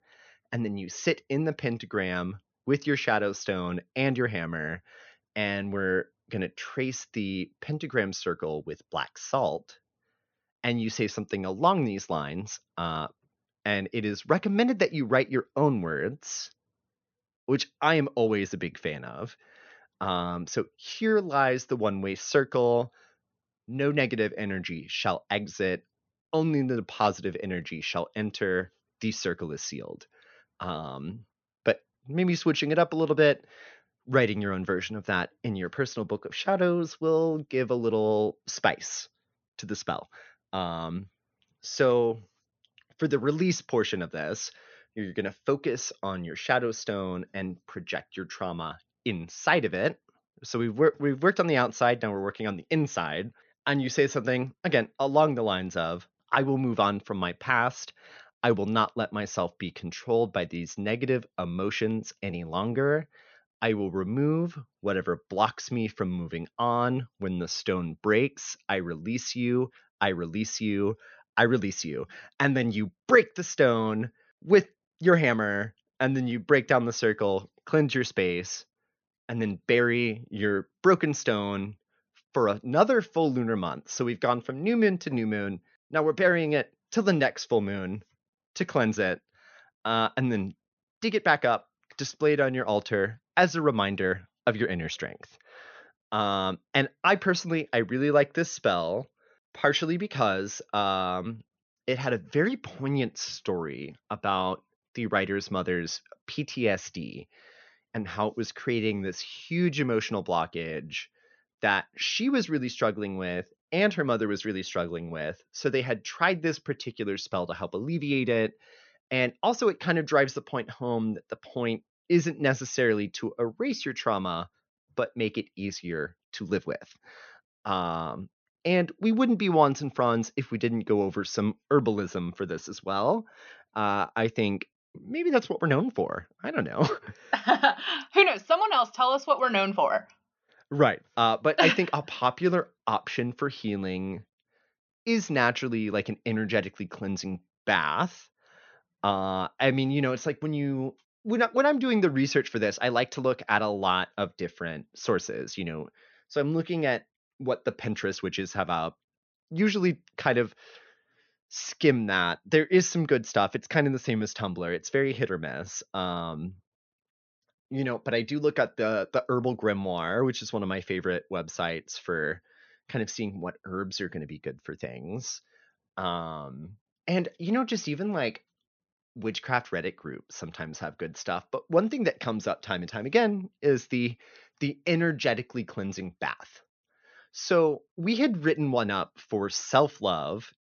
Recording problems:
high frequencies cut off; noticeable; nothing above 6.5 kHz

